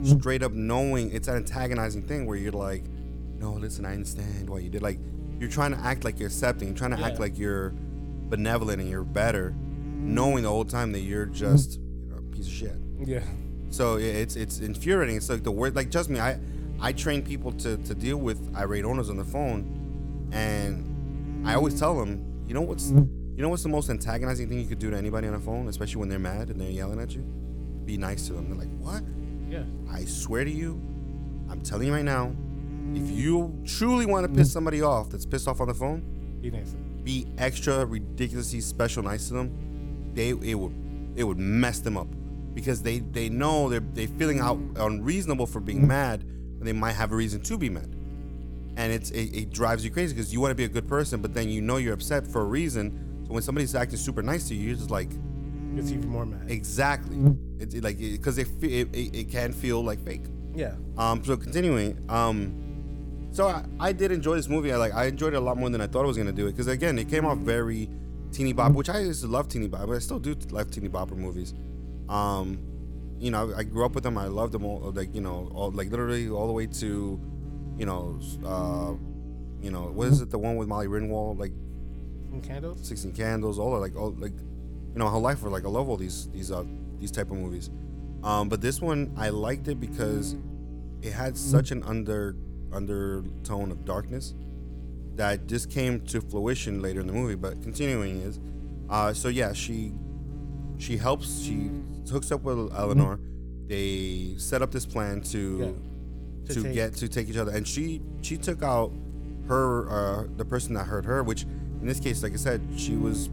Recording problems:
electrical hum; noticeable; throughout; 60 Hz, 15 dB below the speech

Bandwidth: 17.5 kHz